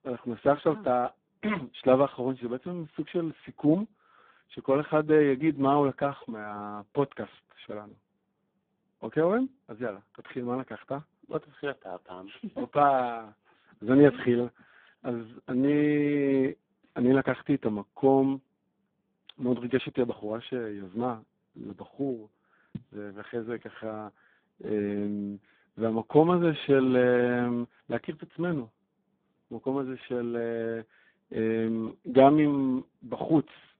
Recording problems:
phone-call audio; poor line

